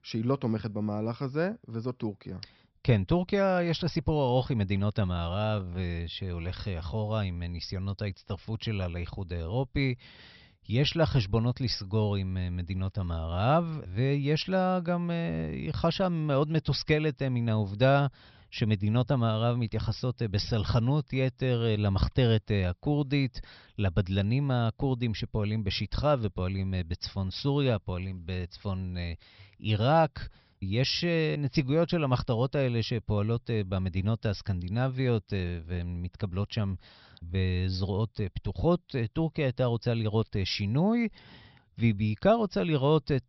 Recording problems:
high frequencies cut off; noticeable; nothing above 5.5 kHz

